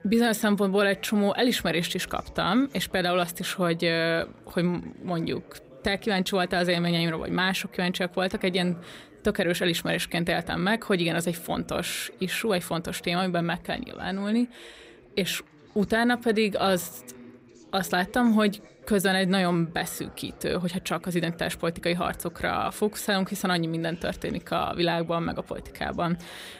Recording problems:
background chatter; faint; throughout; 4 voices, 25 dB below the speech

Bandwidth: 15.5 kHz